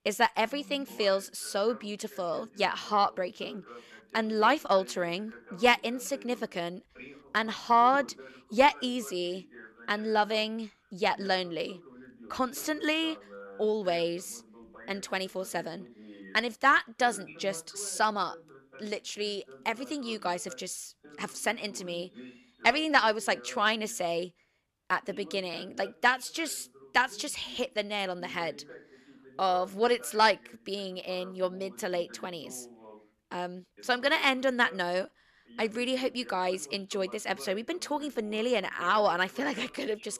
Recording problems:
voice in the background; faint; throughout; 20 dB below the speech

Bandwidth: 13.5 kHz